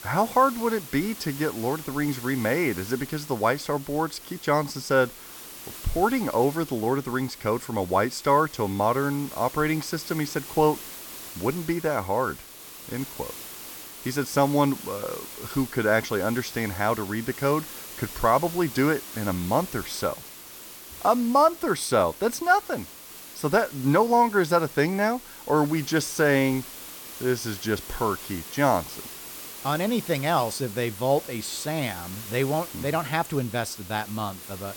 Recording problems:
hiss; noticeable; throughout; 15 dB below the speech

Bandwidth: 17.5 kHz